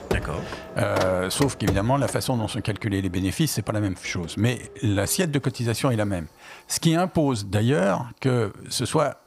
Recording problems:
household noises; noticeable; throughout; 10 dB below the speech

